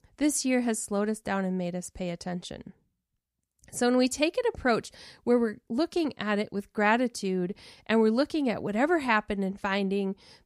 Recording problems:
none

